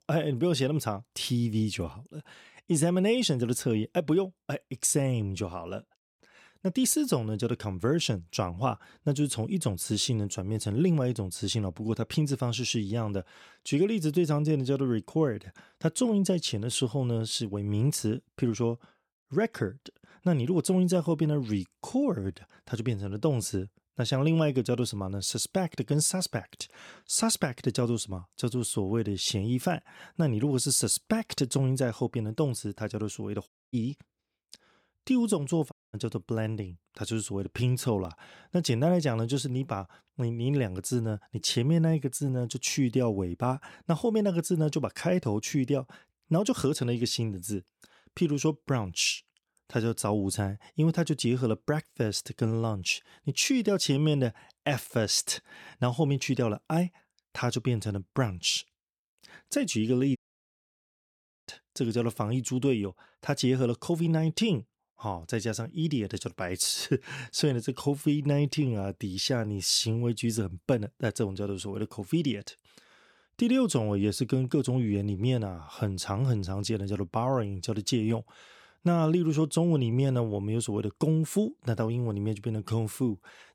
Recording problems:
audio cutting out; at 33 s, at 36 s and at 1:00 for 1.5 s

